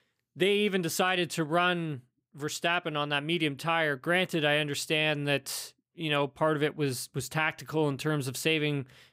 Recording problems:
none

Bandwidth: 15.5 kHz